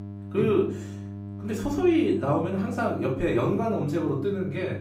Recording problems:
off-mic speech; far
room echo; slight; dies away in 0.4 s
electrical hum; noticeable; throughout; 50 Hz, 20 dB below the speech

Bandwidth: 15.5 kHz